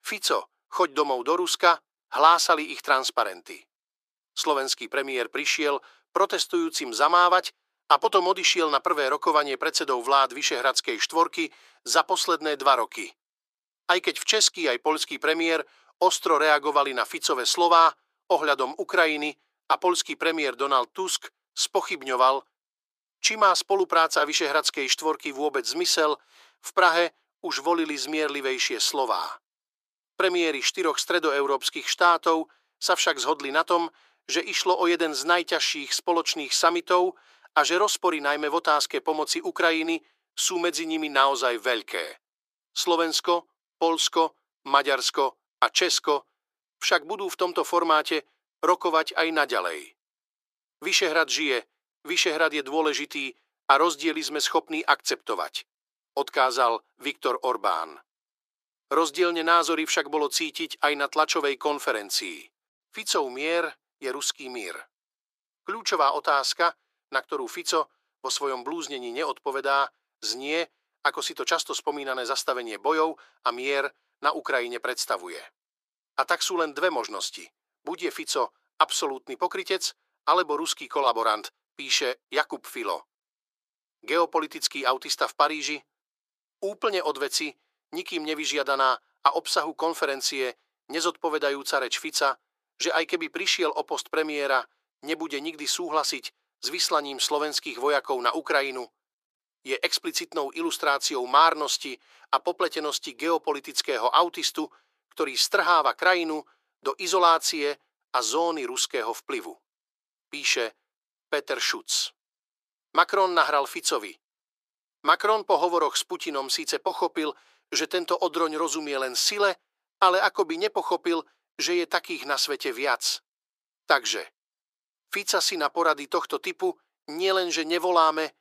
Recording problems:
thin; very; fading below 350 Hz

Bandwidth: 14.5 kHz